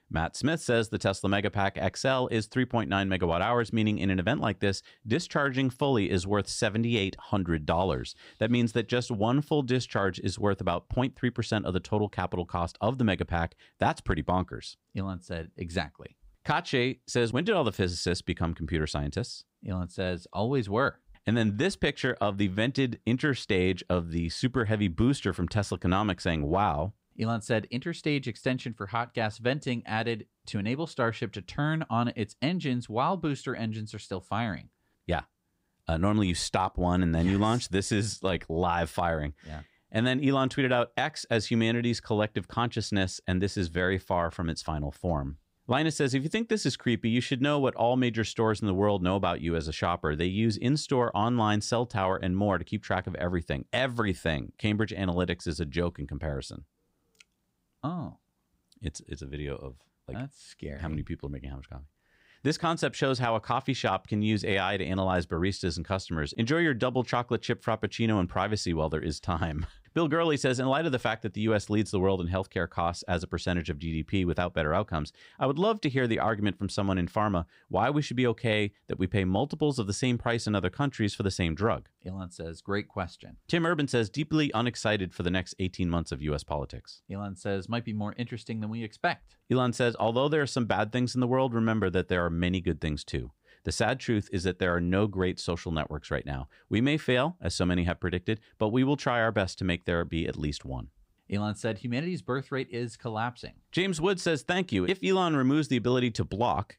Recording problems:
none

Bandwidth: 15.5 kHz